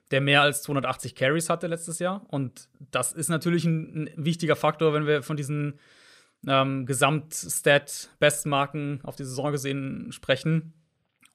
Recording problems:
none

